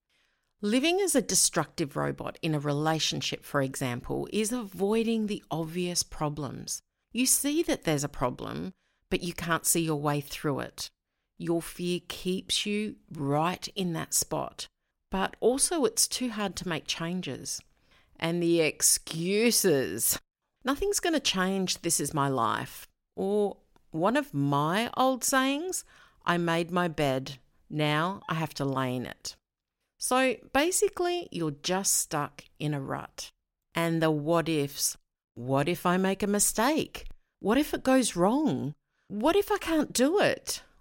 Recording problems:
none

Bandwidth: 16.5 kHz